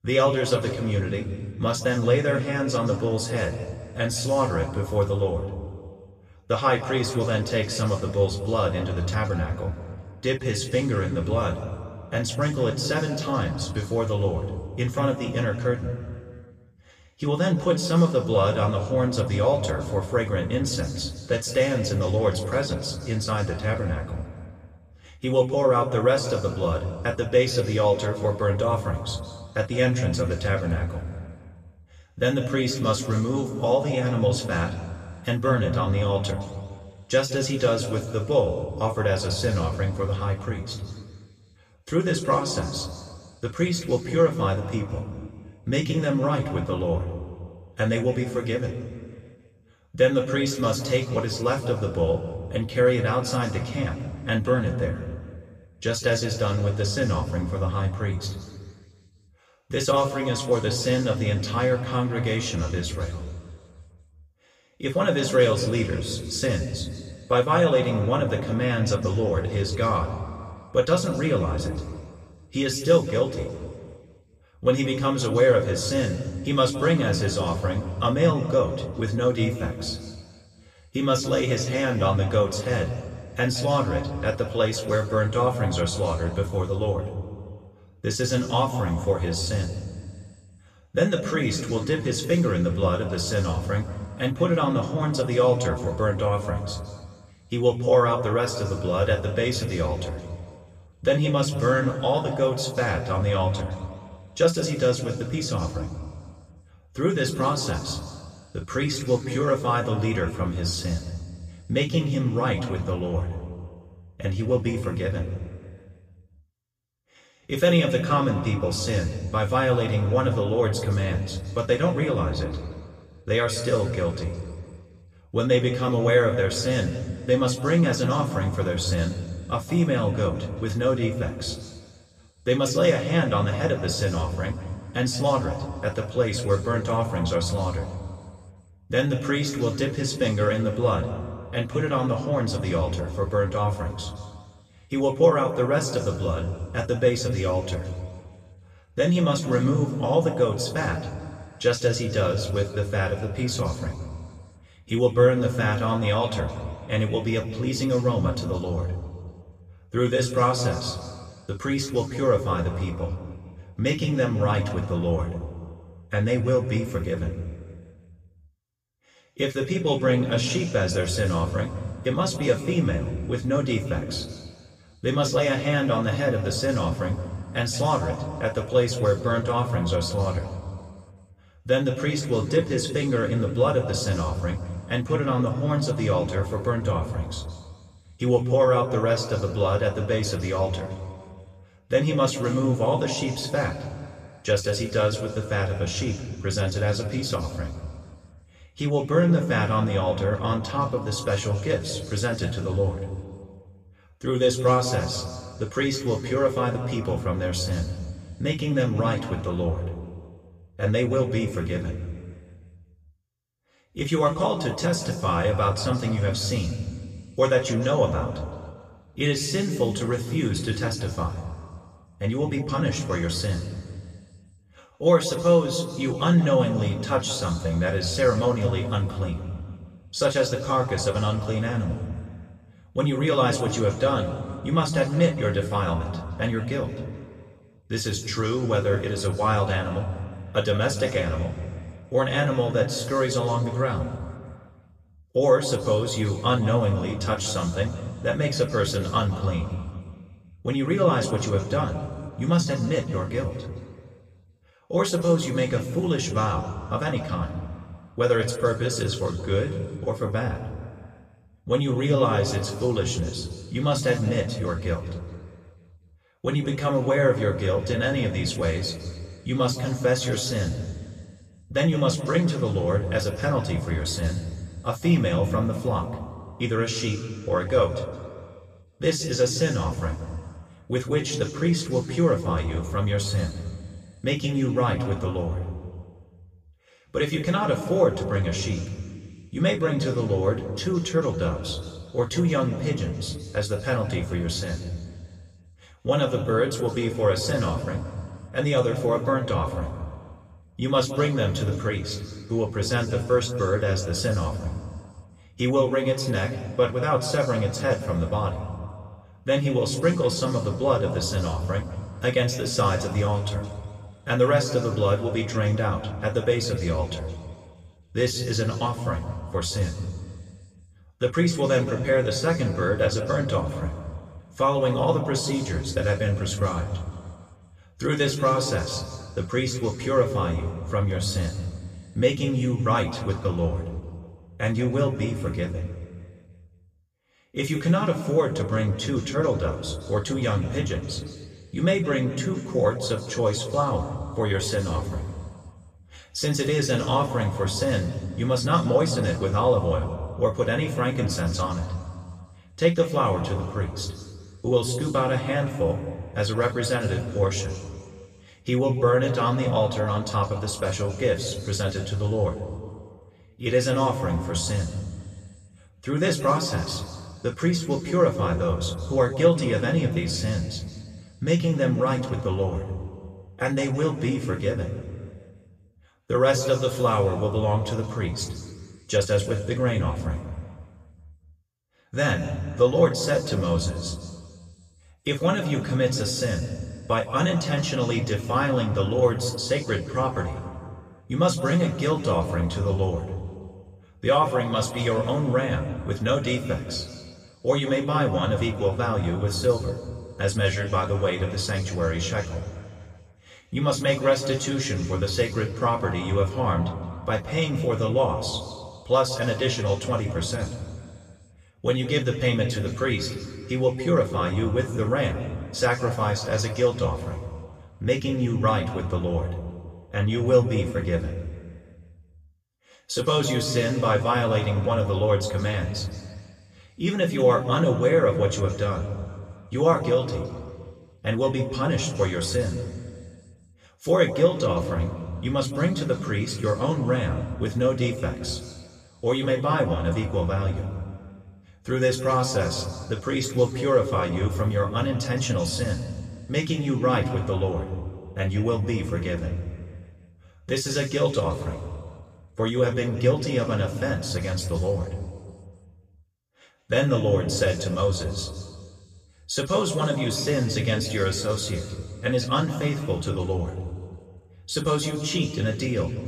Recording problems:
room echo; slight; dies away in 2 s
off-mic speech; somewhat distant

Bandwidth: 14.5 kHz